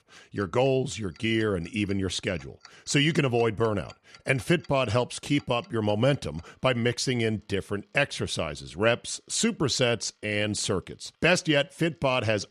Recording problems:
household noises; faint; throughout; 30 dB below the speech

